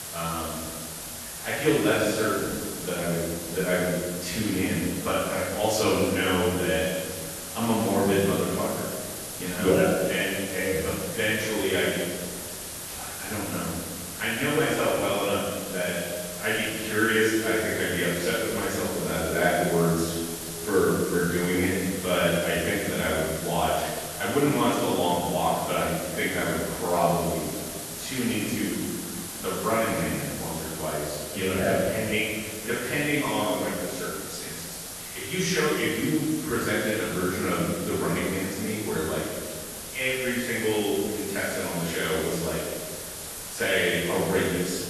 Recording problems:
room echo; strong; dies away in 1.7 s
off-mic speech; far
garbled, watery; slightly; nothing above 12.5 kHz
hiss; loud; throughout; 8 dB below the speech

